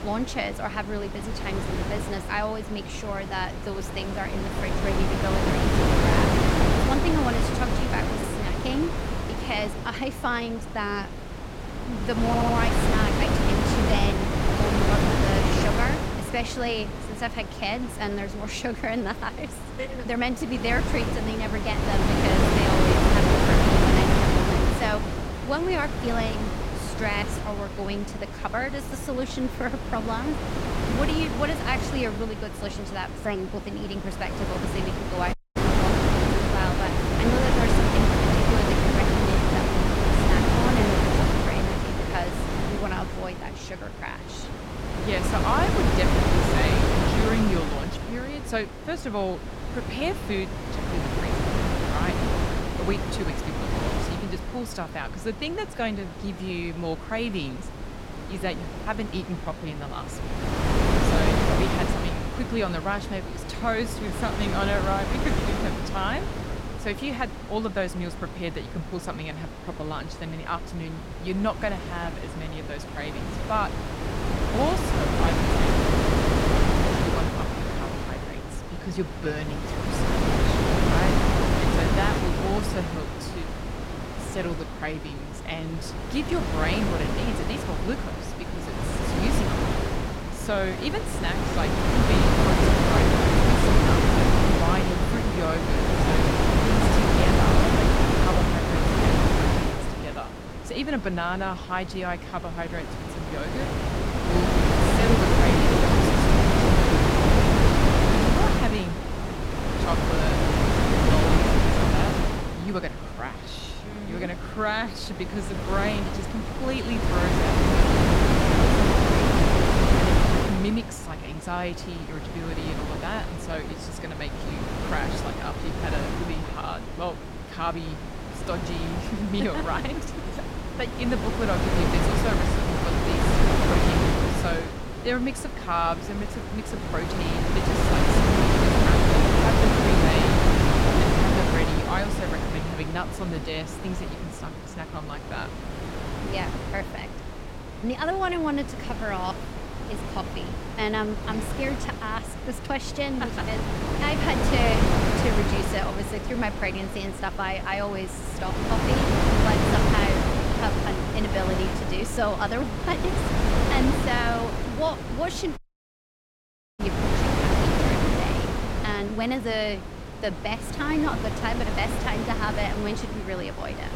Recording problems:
wind noise on the microphone; heavy; 3 dB above the speech
audio stuttering; at 12 s and at 1:16
audio cutting out; at 35 s and at 2:46 for 1 s

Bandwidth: 16 kHz